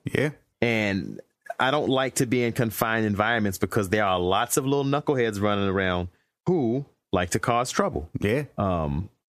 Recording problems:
squashed, flat; heavily

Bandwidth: 14.5 kHz